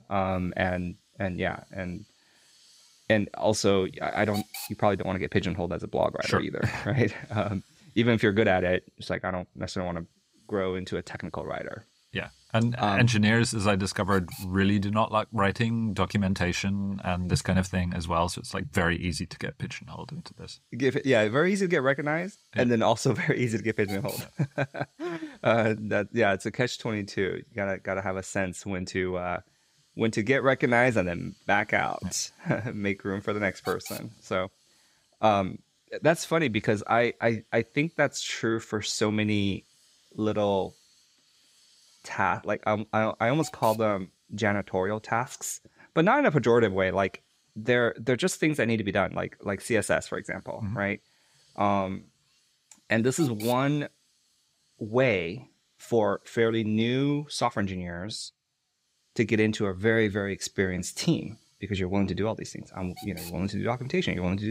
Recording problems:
hiss; faint; throughout; 20 dB below the speech
abrupt cut into speech; at the end

